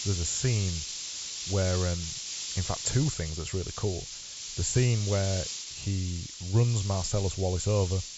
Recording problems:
high frequencies cut off; noticeable; nothing above 8 kHz
hiss; loud; throughout; 6 dB below the speech

